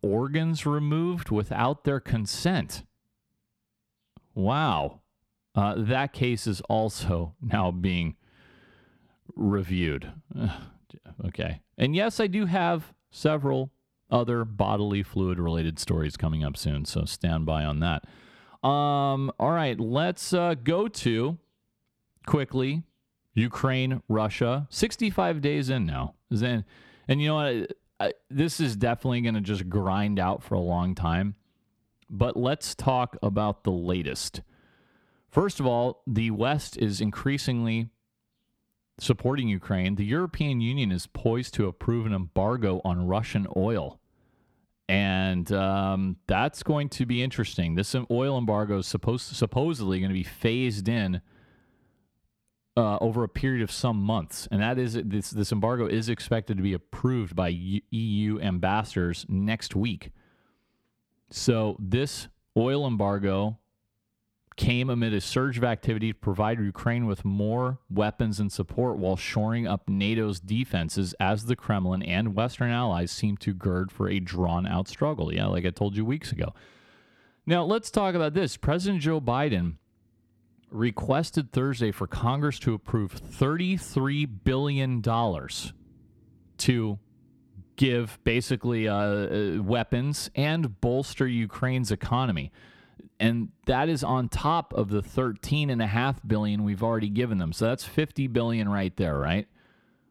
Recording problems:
none

